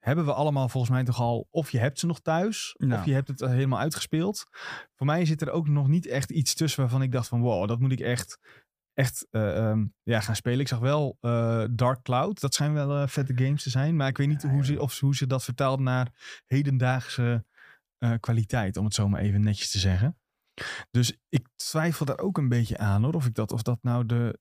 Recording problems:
none

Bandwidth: 15 kHz